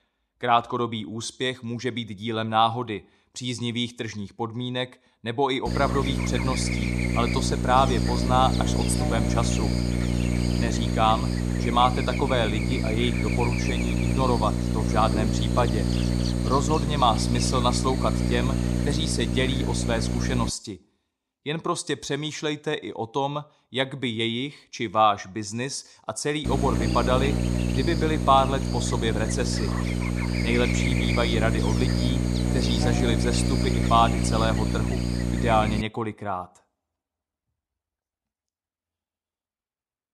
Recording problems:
electrical hum; loud; from 5.5 to 20 s and from 26 to 36 s; 60 Hz, 6 dB below the speech

